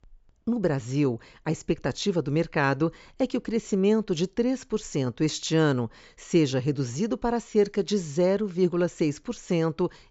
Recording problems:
high frequencies cut off; noticeable; nothing above 8 kHz

